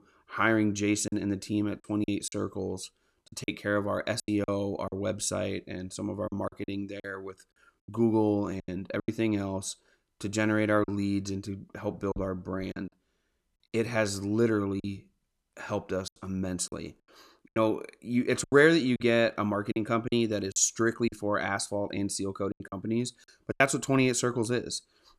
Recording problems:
choppy; very; 8% of the speech affected

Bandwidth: 13.5 kHz